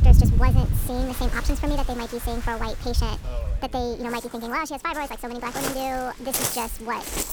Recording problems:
wrong speed and pitch; too fast and too high; 1.5 times normal speed
rain or running water; very loud; throughout; 4 dB above the speech
background chatter; faint; throughout; 4 voices, 25 dB below the speech

